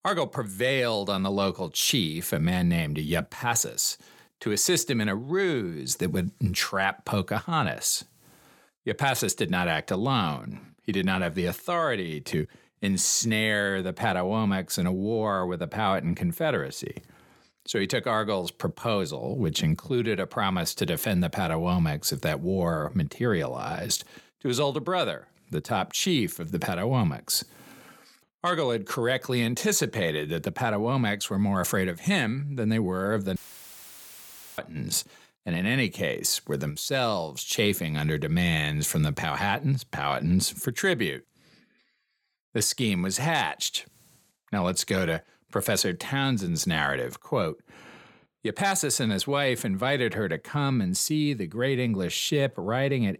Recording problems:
audio cutting out; filled with static; at 33 s for 1 s

